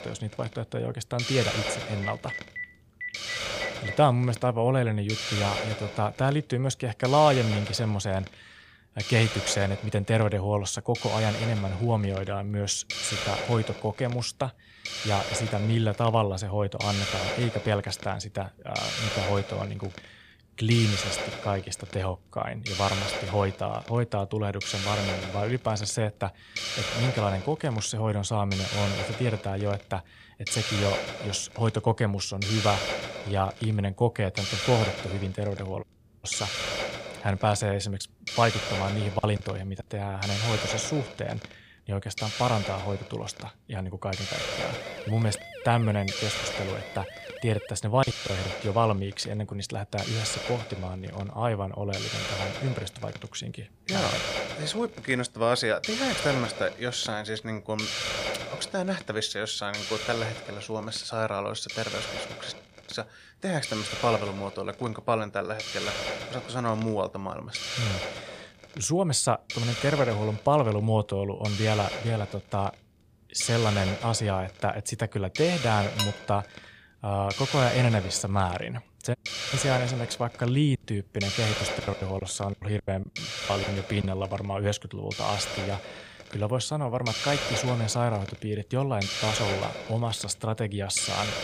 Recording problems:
hiss; loud; throughout; 4 dB below the speech
phone ringing; noticeable; from 2 to 4 s; peak 6 dB below the speech
audio cutting out; at 36 s, at 1:03 and at 1:19
choppy; very; at 39 s, at 48 s and from 1:21 to 1:24; 16% of the speech affected
siren; faint; from 44 to 48 s; peak 10 dB below the speech
clattering dishes; noticeable; at 1:16; peak 2 dB below the speech

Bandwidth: 15 kHz